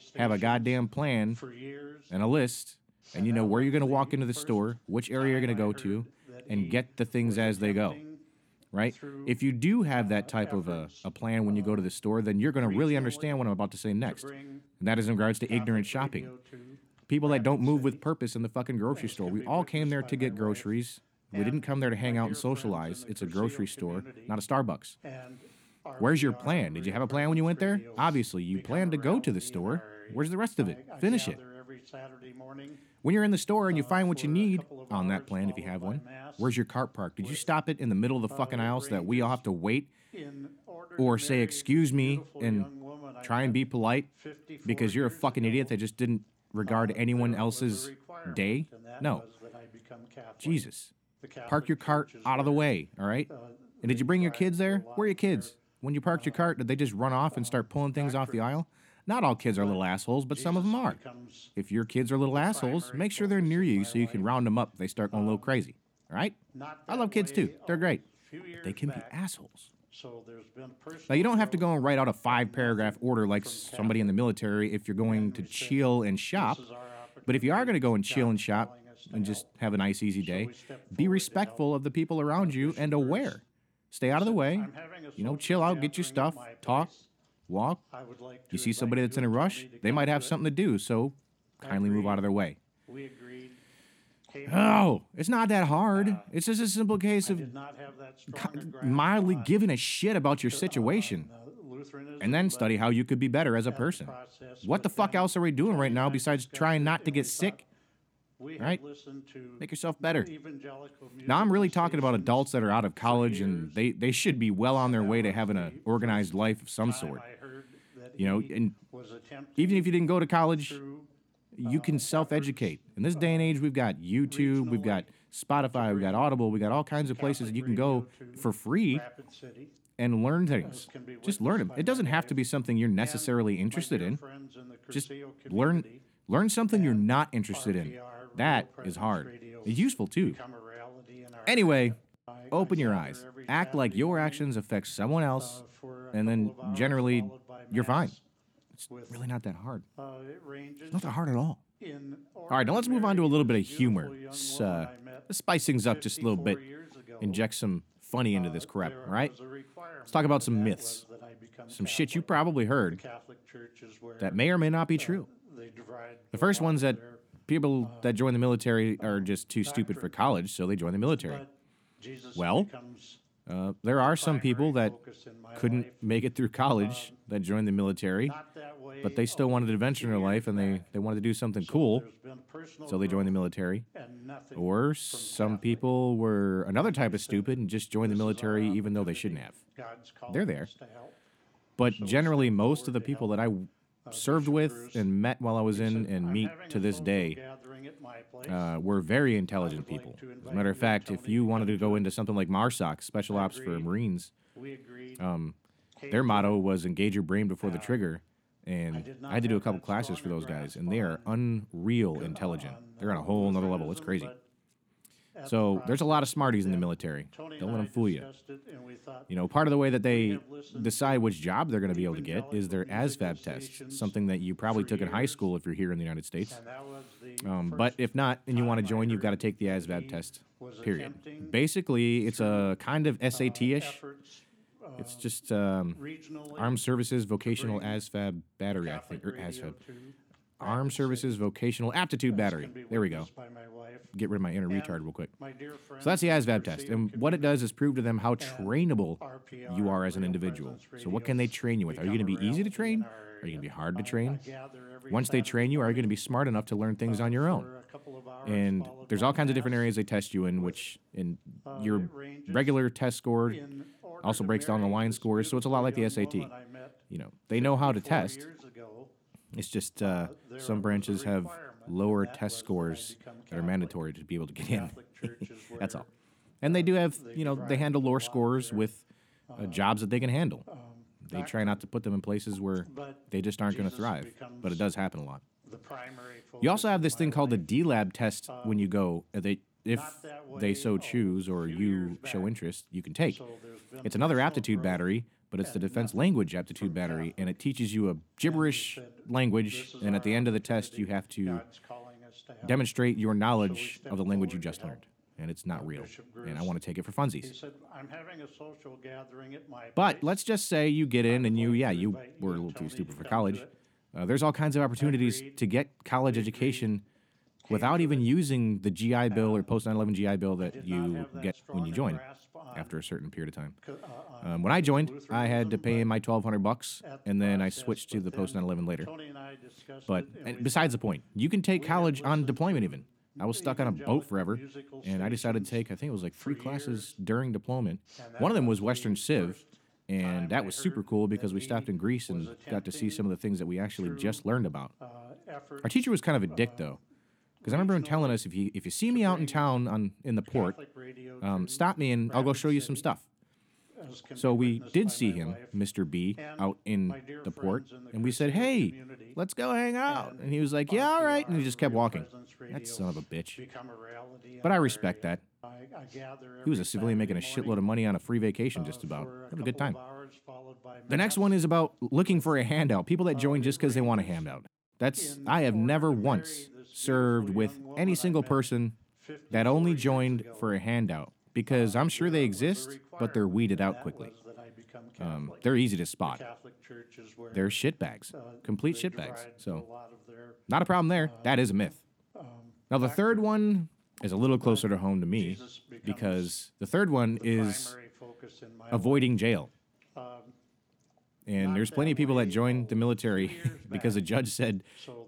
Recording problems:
voice in the background; noticeable; throughout; 20 dB below the speech

